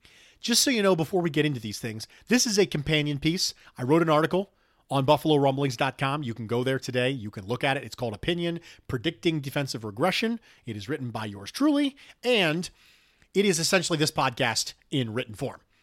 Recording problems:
none

